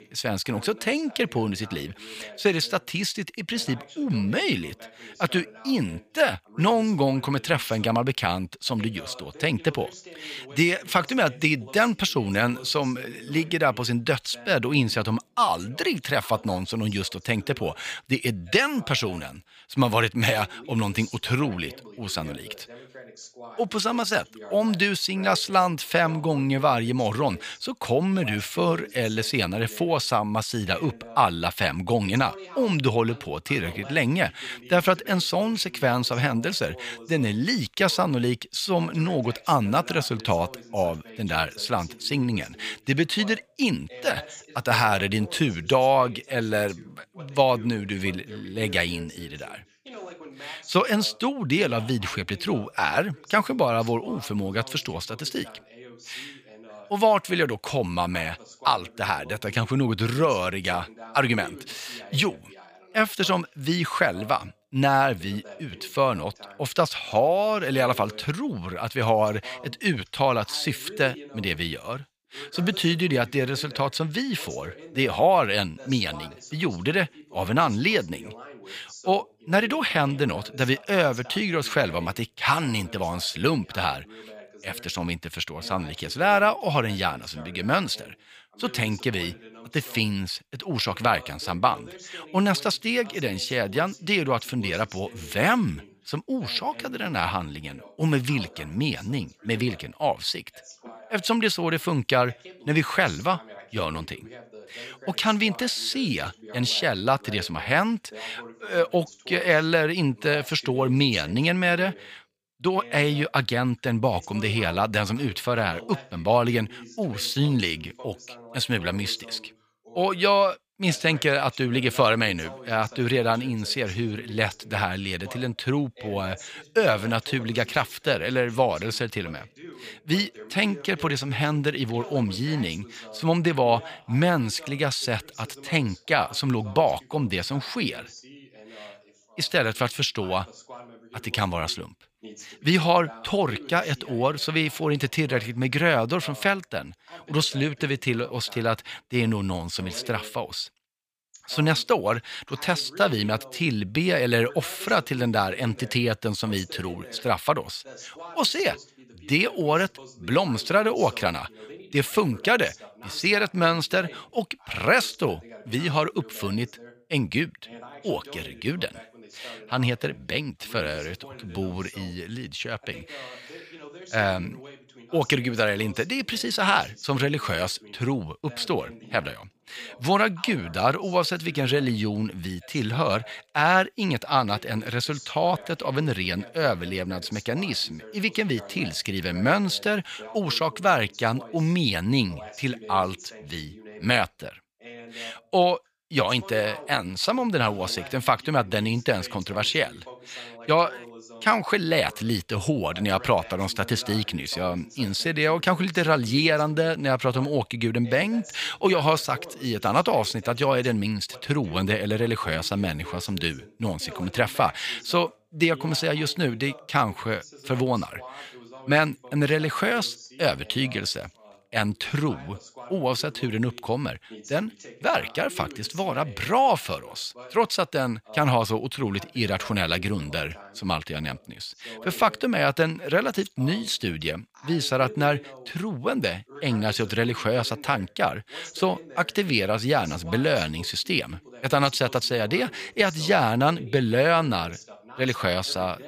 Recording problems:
voice in the background; faint; throughout; 20 dB below the speech

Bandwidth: 15 kHz